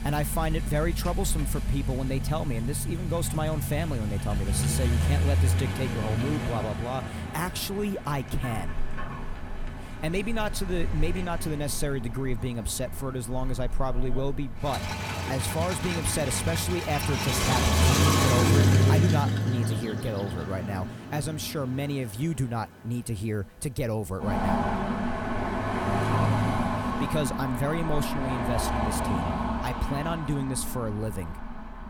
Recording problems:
traffic noise; very loud; throughout; 2 dB above the speech

